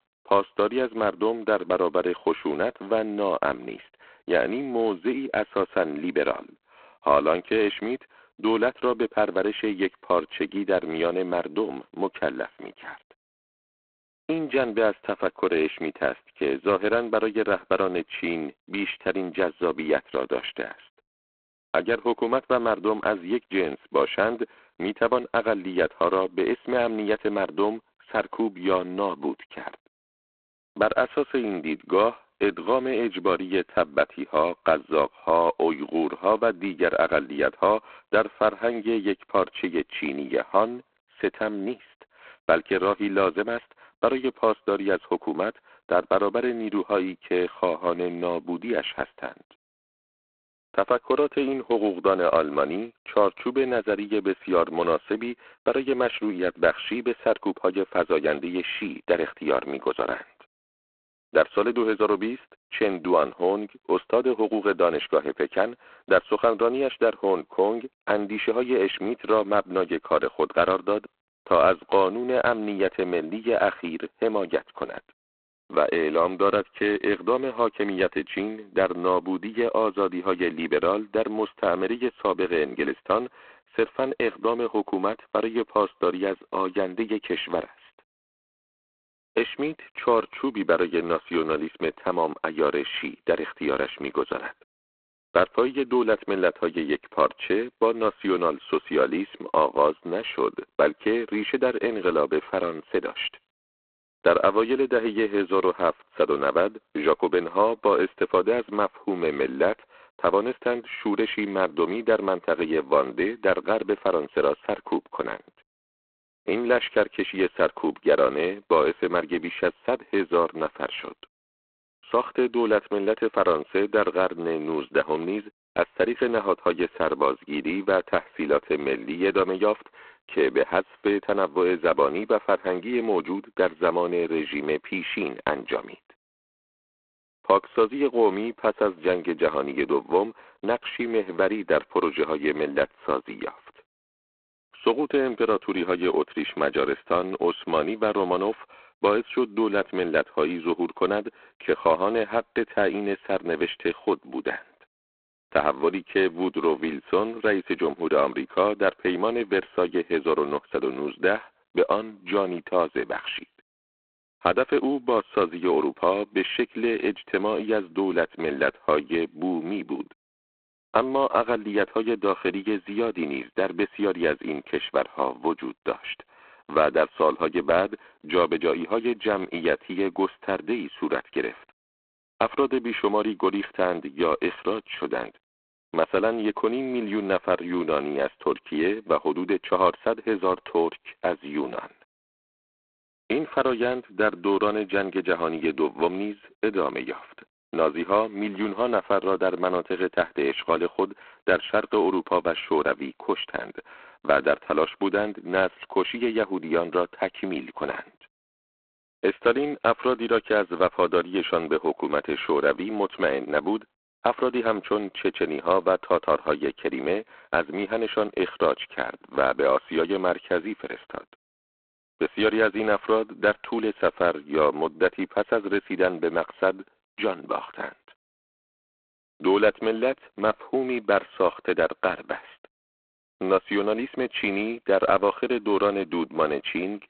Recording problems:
phone-call audio; poor line; nothing above 3.5 kHz

